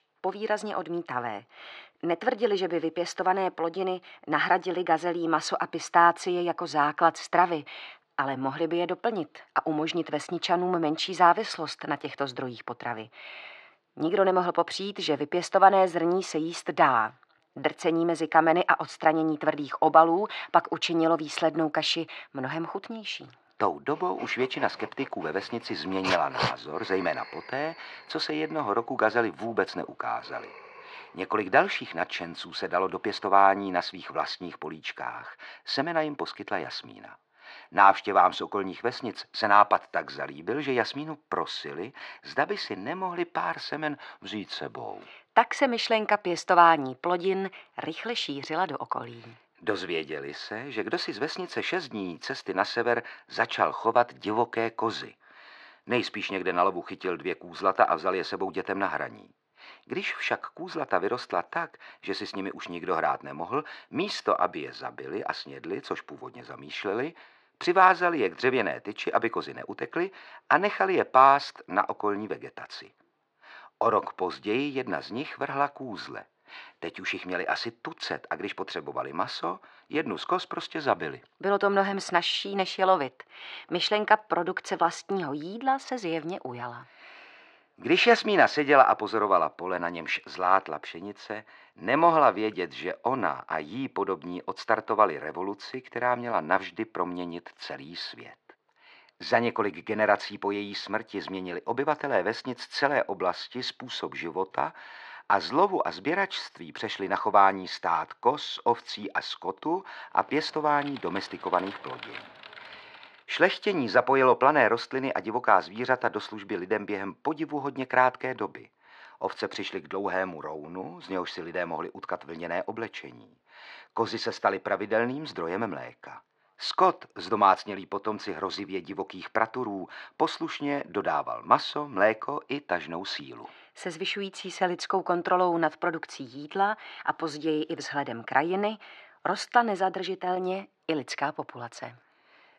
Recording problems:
muffled; slightly; fading above 2 kHz
thin; somewhat; fading below 550 Hz
dog barking; noticeable; from 24 to 27 s; peak 1 dB below the speech
keyboard typing; faint; from 1:50 to 1:53; peak 15 dB below the speech

